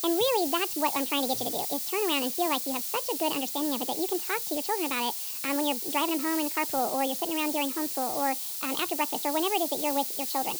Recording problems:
wrong speed and pitch; too fast and too high; 1.5 times normal speed
high frequencies cut off; slight; nothing above 8 kHz
hiss; loud; throughout; 1 dB below the speech

